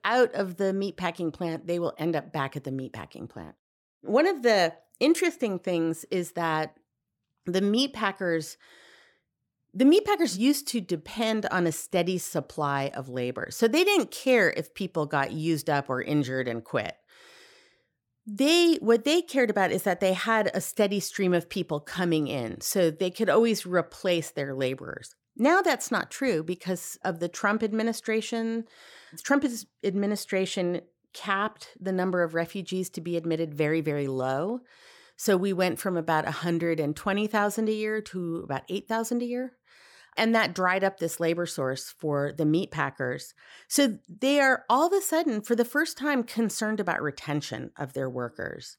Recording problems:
none

